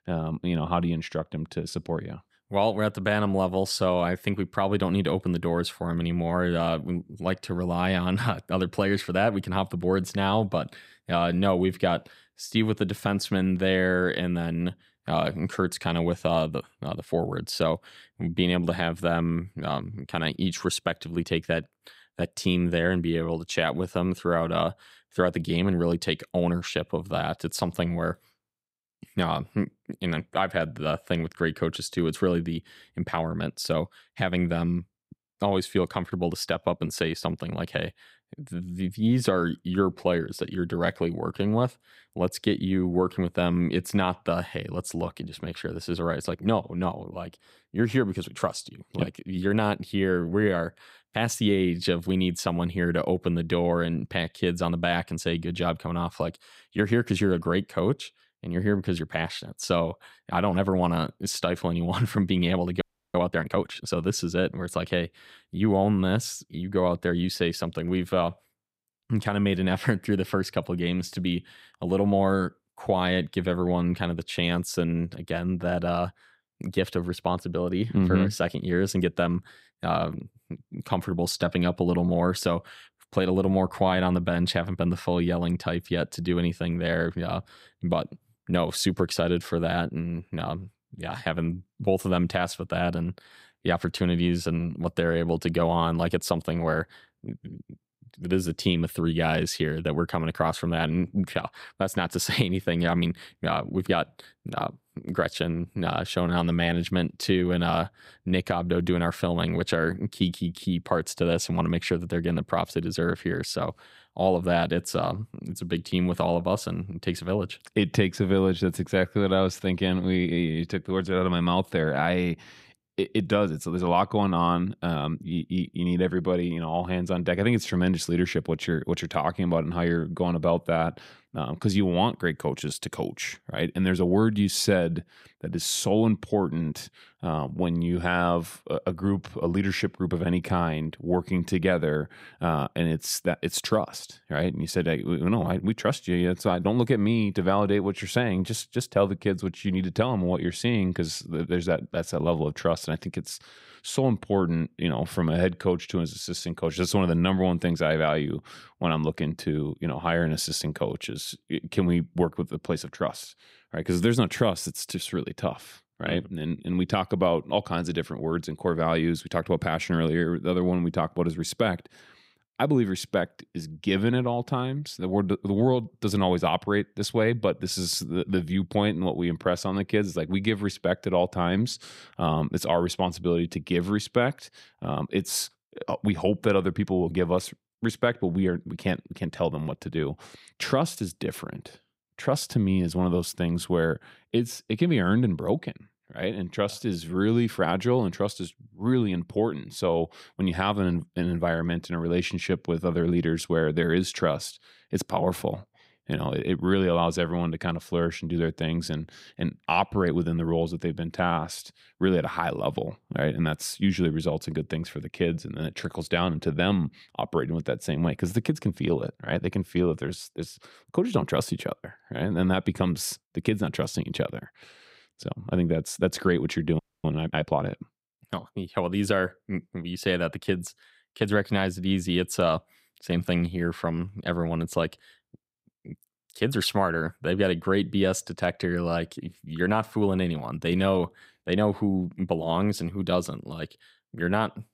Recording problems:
audio freezing; at 1:03 and at 3:47

